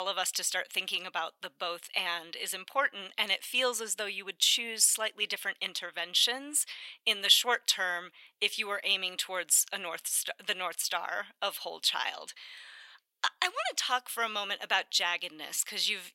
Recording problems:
thin; very; fading below 900 Hz
abrupt cut into speech; at the start

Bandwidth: 16 kHz